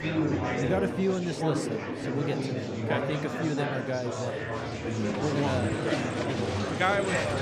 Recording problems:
murmuring crowd; very loud; throughout; 1 dB above the speech

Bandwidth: 15.5 kHz